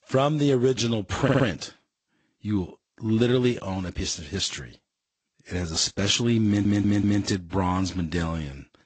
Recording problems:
garbled, watery; slightly; nothing above 7.5 kHz
audio stuttering; at 1 s and at 6.5 s

